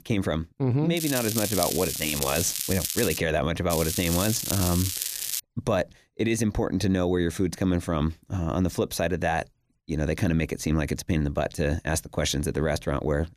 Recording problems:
crackling; loud; from 1 to 3 s and from 3.5 to 5.5 s; 2 dB below the speech

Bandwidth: 14.5 kHz